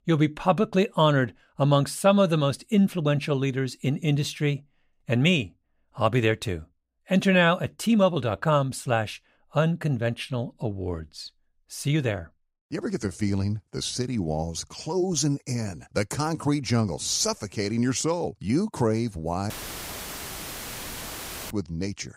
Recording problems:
audio cutting out; filled with static; at 20 s for 2 s

